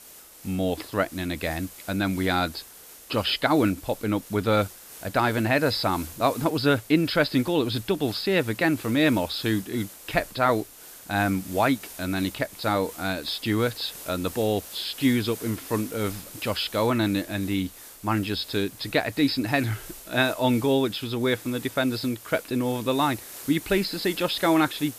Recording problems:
high frequencies cut off; noticeable; nothing above 5.5 kHz
hiss; noticeable; throughout; 15 dB below the speech

